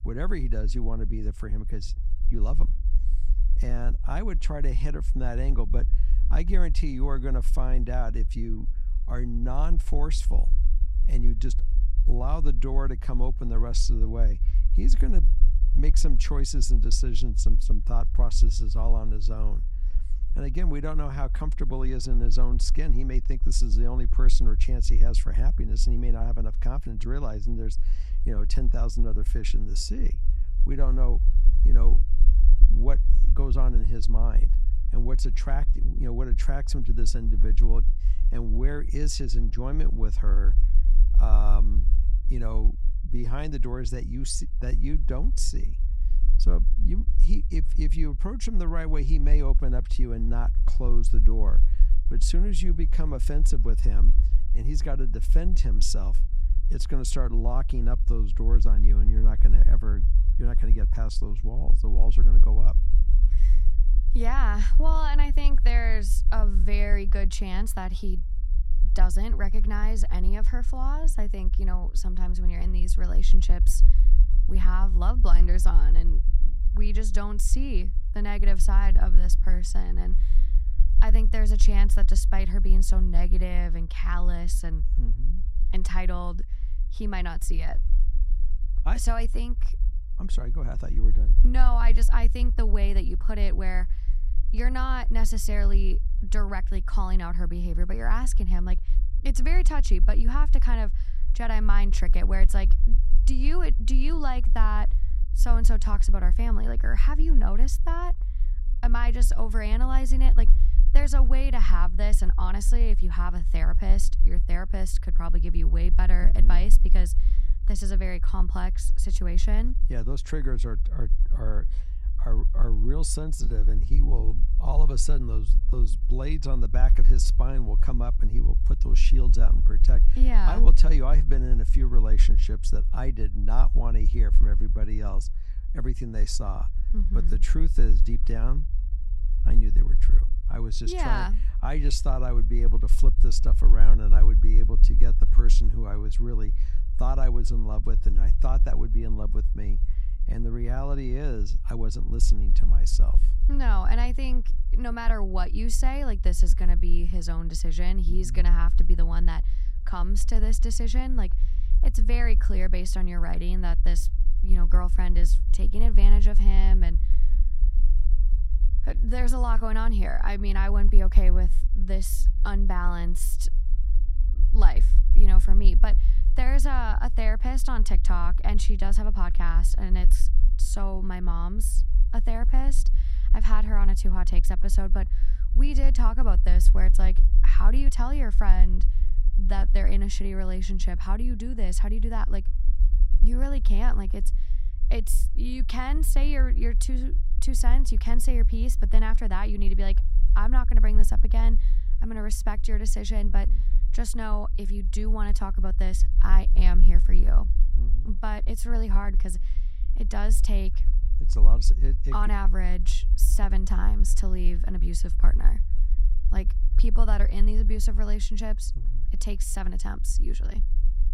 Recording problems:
low rumble; noticeable; throughout; 15 dB below the speech

